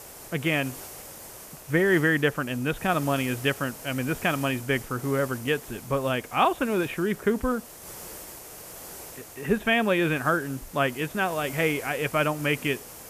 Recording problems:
high frequencies cut off; severe; nothing above 4 kHz
hiss; noticeable; throughout; 15 dB below the speech

